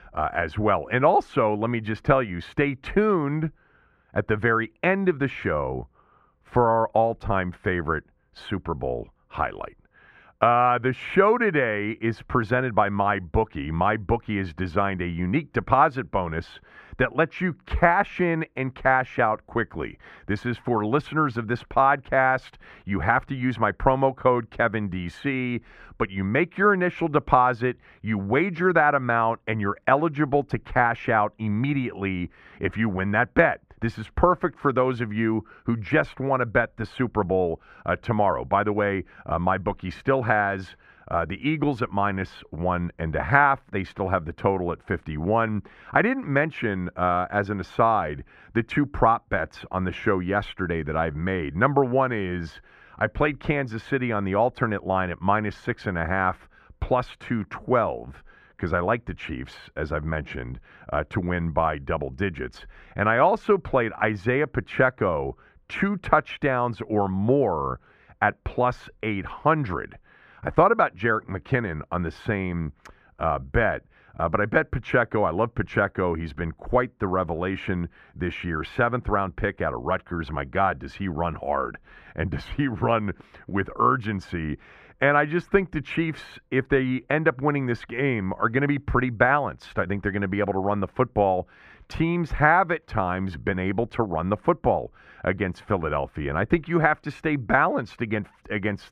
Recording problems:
muffled; slightly; fading above 2.5 kHz

